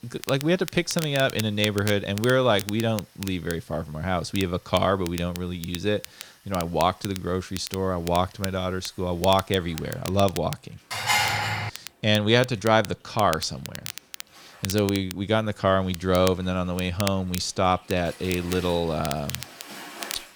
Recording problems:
crackle, like an old record; noticeable; 15 dB below the speech
rain or running water; faint; throughout; 25 dB below the speech
clattering dishes; loud; at 11 s; peak 4 dB above the speech

